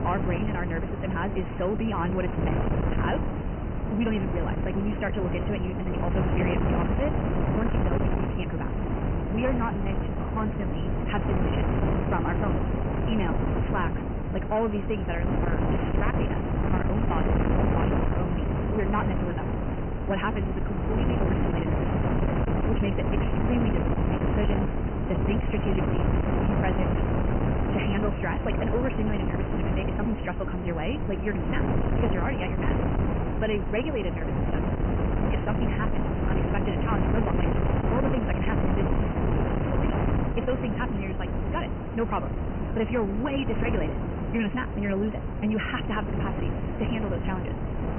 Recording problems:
high frequencies cut off; severe; nothing above 3 kHz
wrong speed, natural pitch; too fast; 1.5 times normal speed
distortion; slight; 10 dB below the speech
wind noise on the microphone; heavy; 1 dB below the speech

